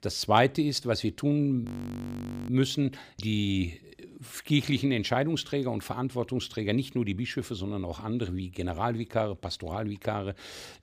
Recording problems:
audio freezing; at 1.5 s for 1 s

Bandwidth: 15 kHz